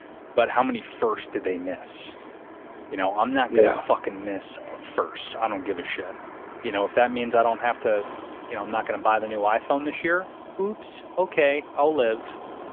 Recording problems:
phone-call audio; nothing above 3.5 kHz
traffic noise; noticeable; throughout; 15 dB below the speech

